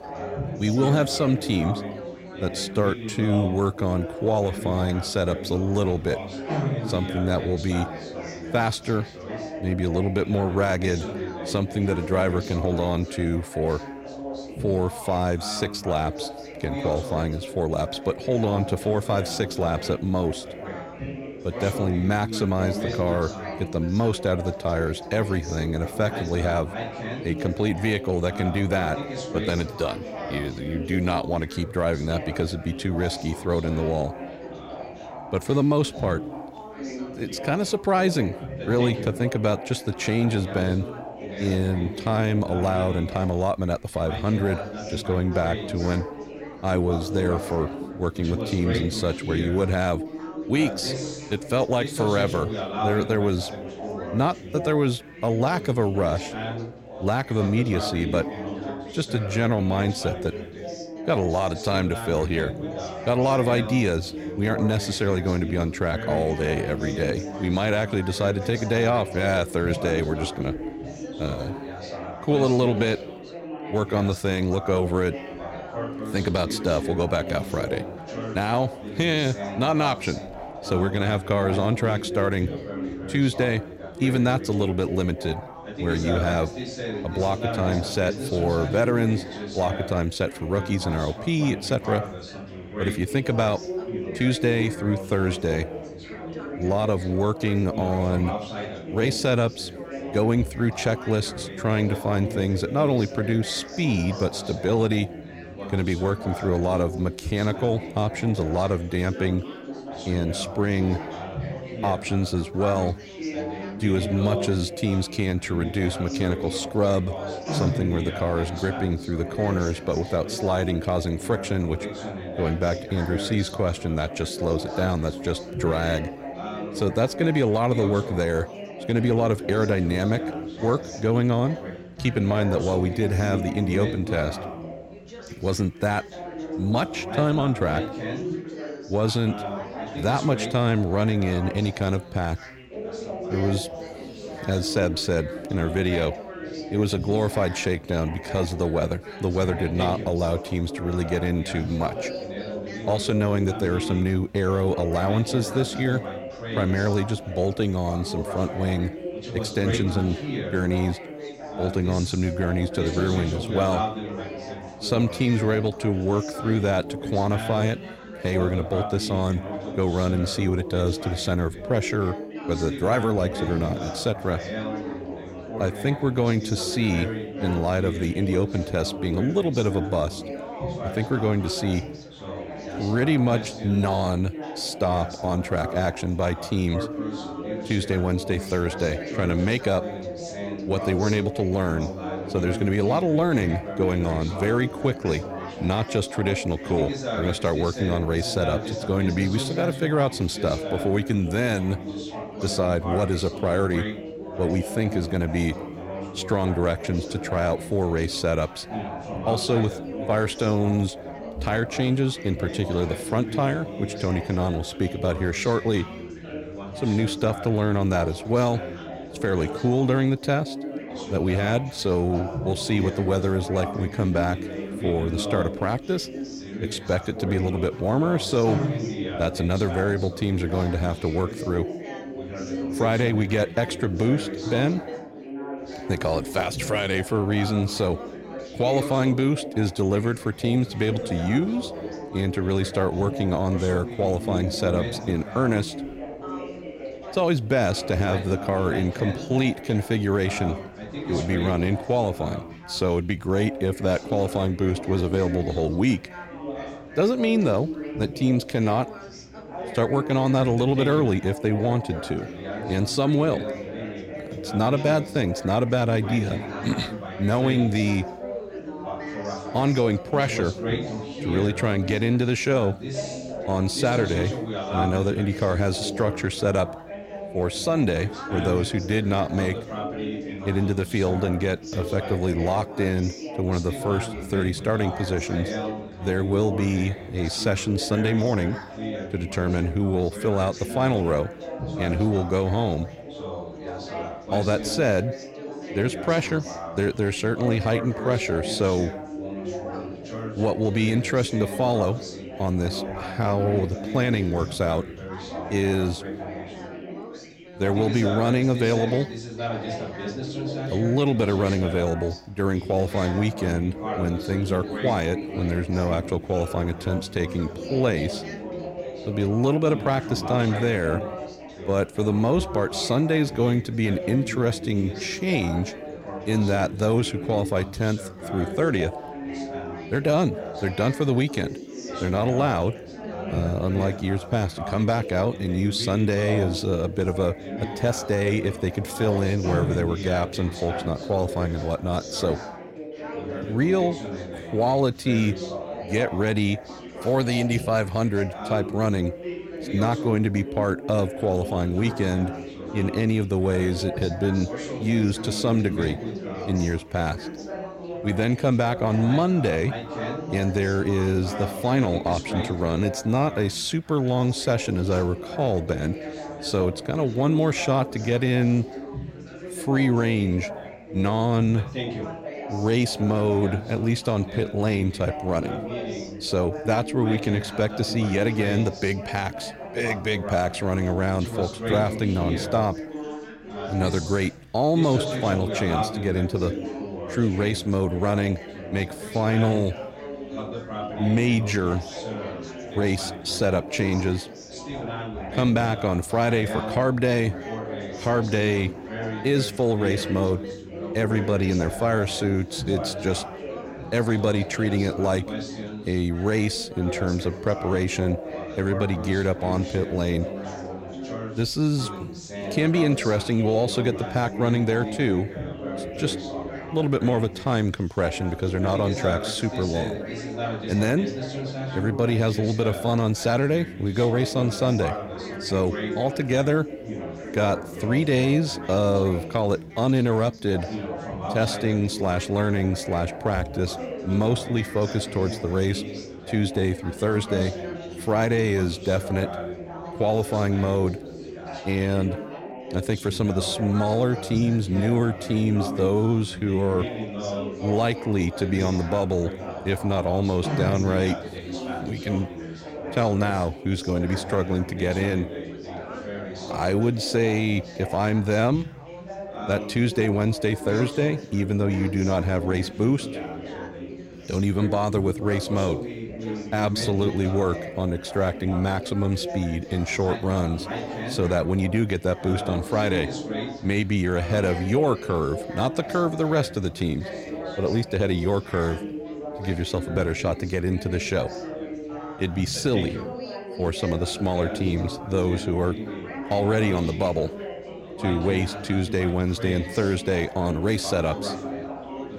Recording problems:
background chatter; loud; throughout; 4 voices, 8 dB below the speech

